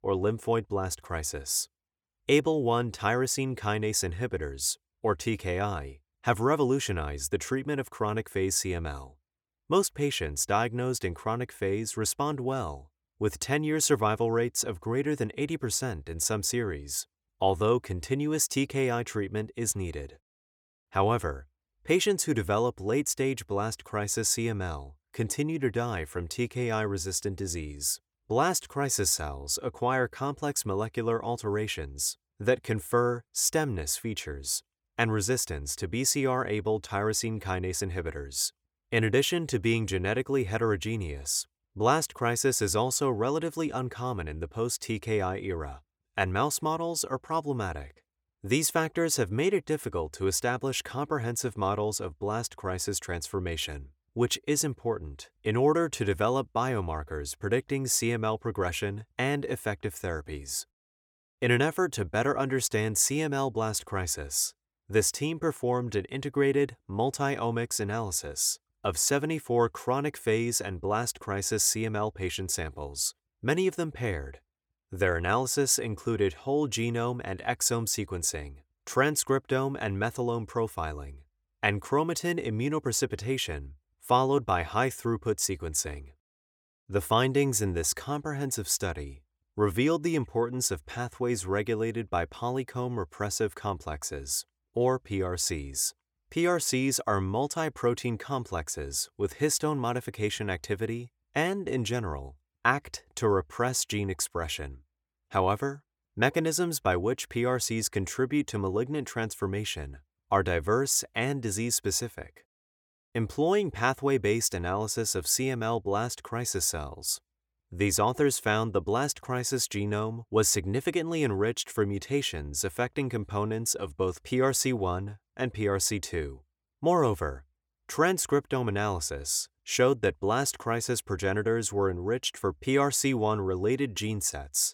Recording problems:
none

